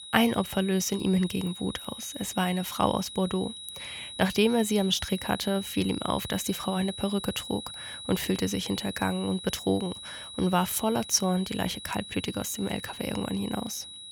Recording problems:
high-pitched whine; noticeable; throughout; 4 kHz, 10 dB below the speech

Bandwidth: 17.5 kHz